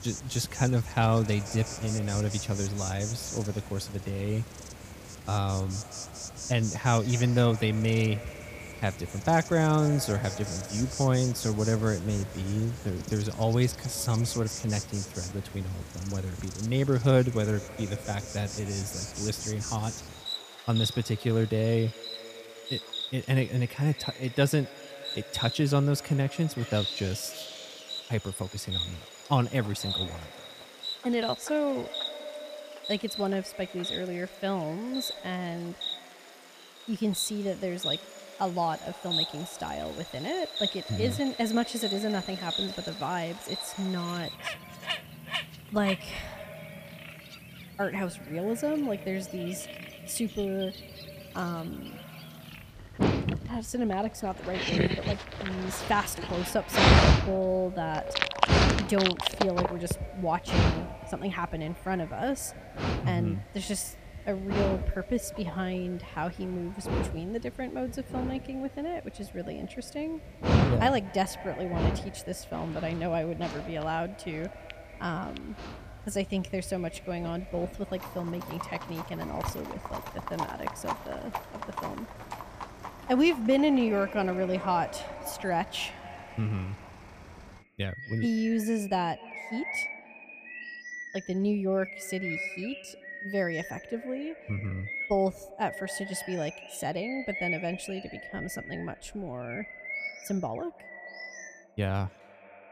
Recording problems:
echo of what is said; noticeable; throughout; 230 ms later, 15 dB below the speech
animal sounds; loud; throughout; 3 dB below the speech

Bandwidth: 15 kHz